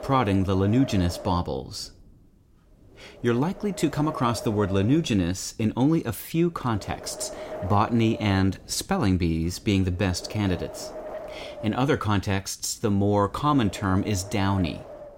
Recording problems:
wind noise on the microphone; occasional gusts; 10 dB below the speech

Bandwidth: 16 kHz